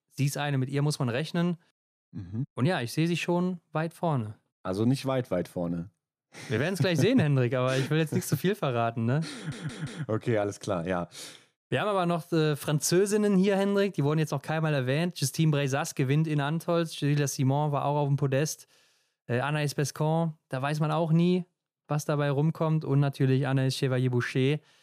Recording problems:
audio stuttering; at 9.5 s

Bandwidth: 15 kHz